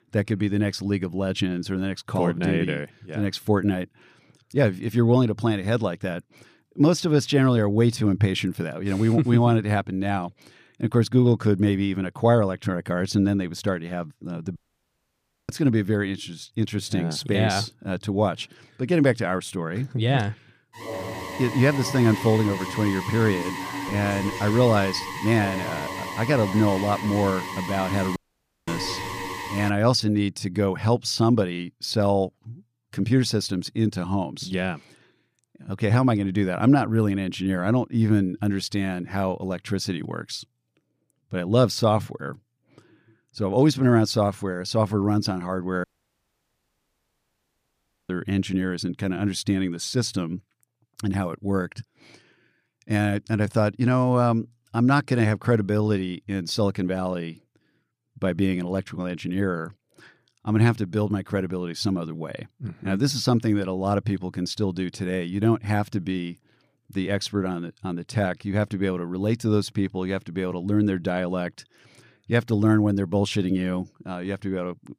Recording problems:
audio cutting out; at 15 s for 1 s, at 28 s for 0.5 s and at 46 s for 2.5 s
alarm; noticeable; from 21 to 30 s; peak 7 dB below the speech

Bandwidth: 15 kHz